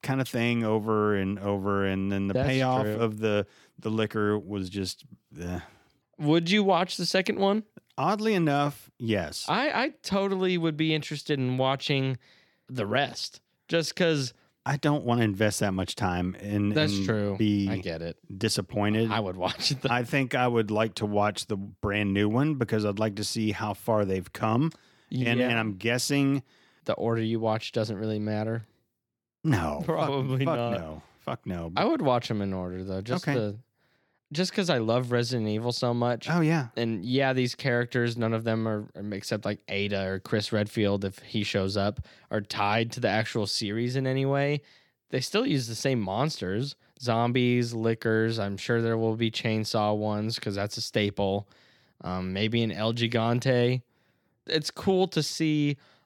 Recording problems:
none

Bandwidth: 17.5 kHz